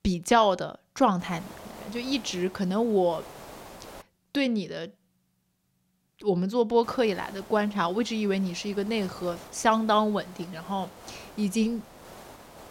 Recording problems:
hiss; noticeable; from 1 to 4 s and from 7 s on; 20 dB below the speech

